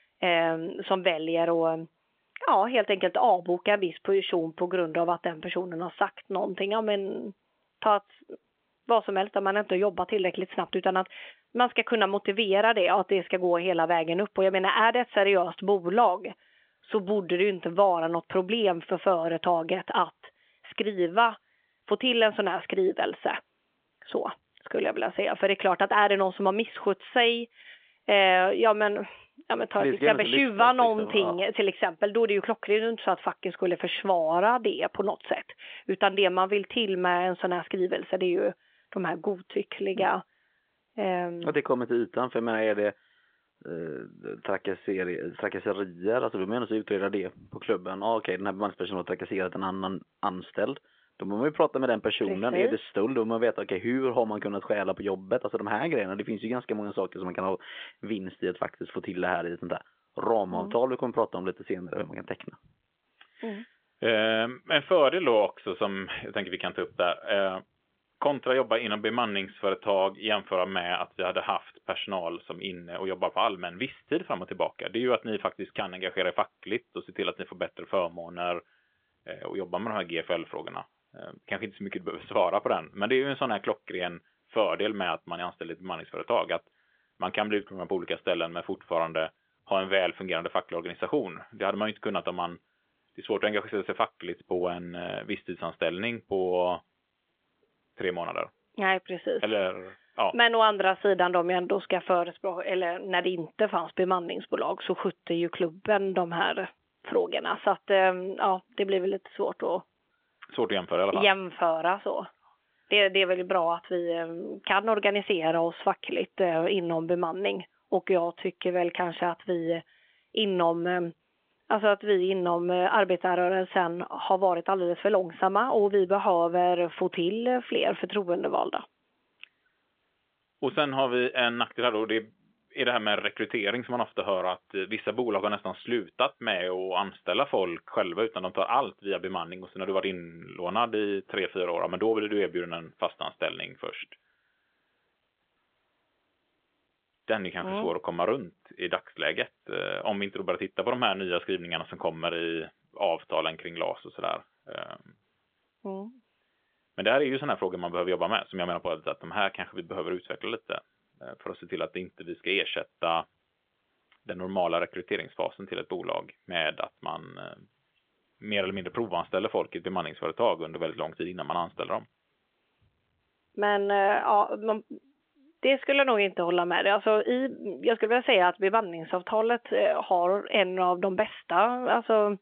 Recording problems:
phone-call audio; nothing above 3.5 kHz

